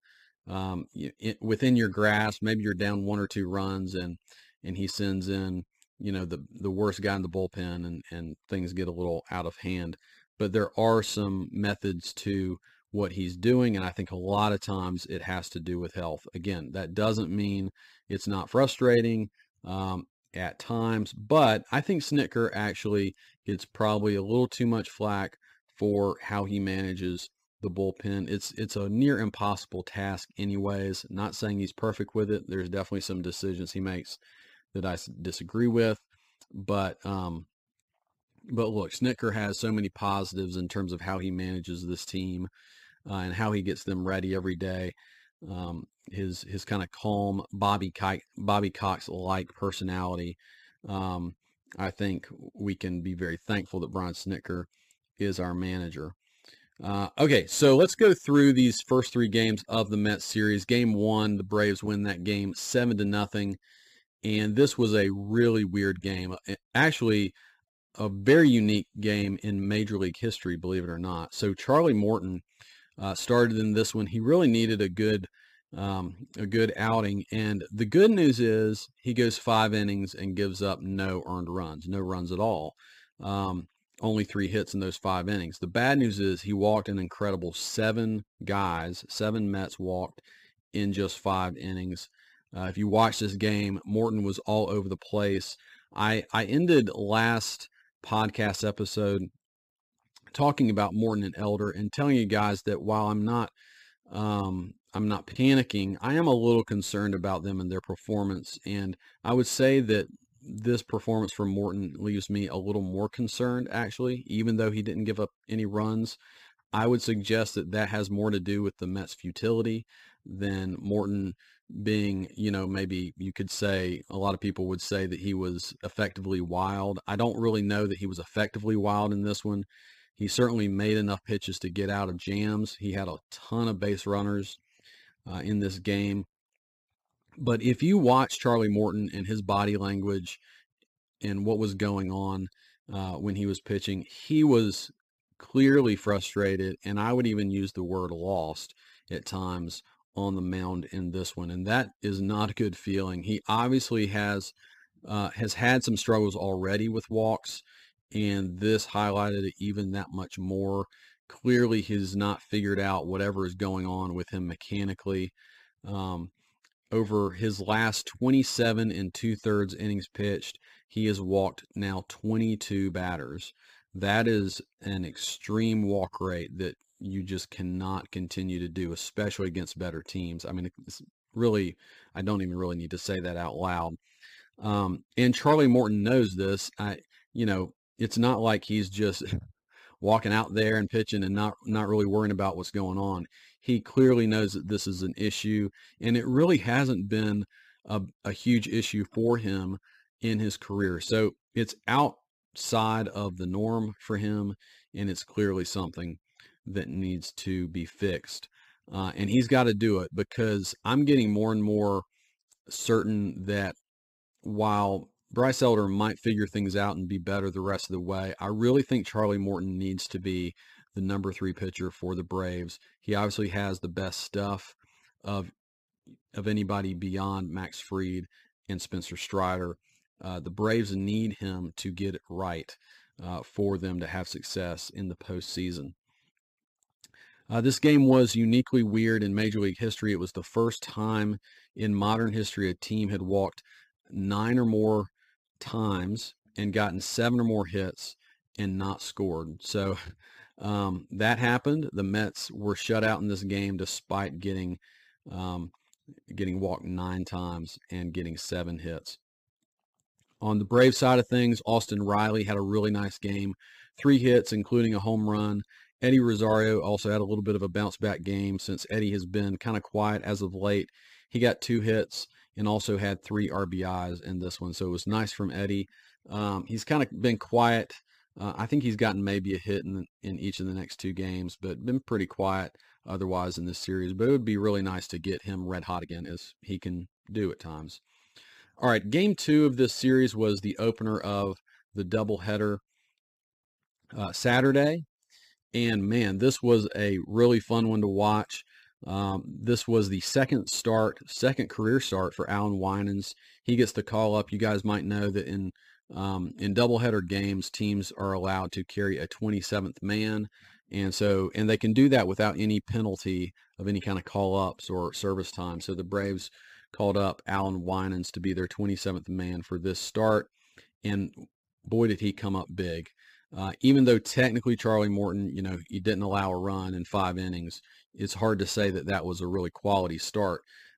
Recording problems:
uneven, jittery; strongly; from 23 s to 4:46

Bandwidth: 15 kHz